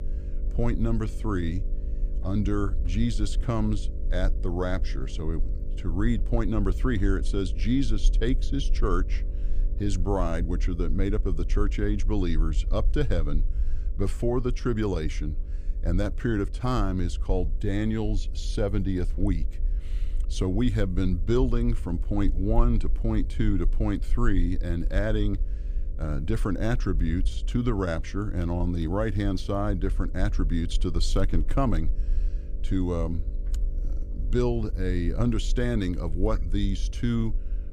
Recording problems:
electrical hum; faint; throughout; 50 Hz, 20 dB below the speech
low rumble; faint; throughout; 25 dB below the speech

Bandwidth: 15 kHz